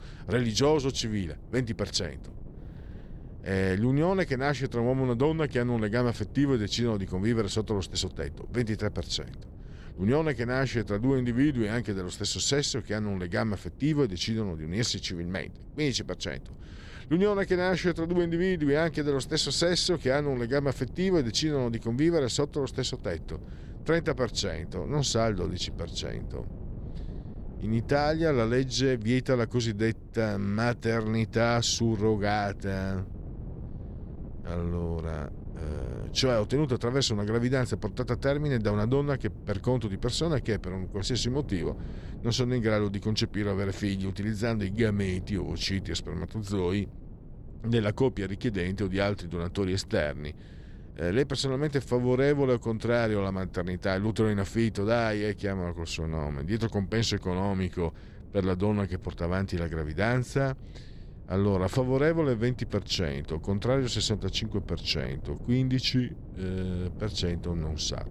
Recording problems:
wind noise on the microphone; occasional gusts; 25 dB below the speech

